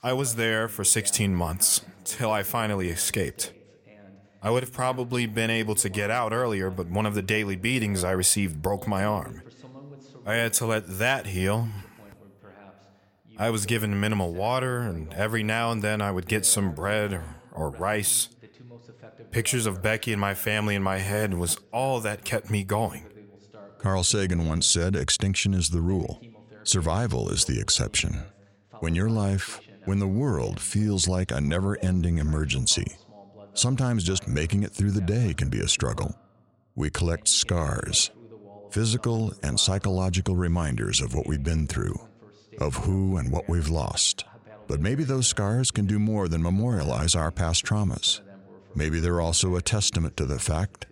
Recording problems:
voice in the background; faint; throughout; 25 dB below the speech

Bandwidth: 17 kHz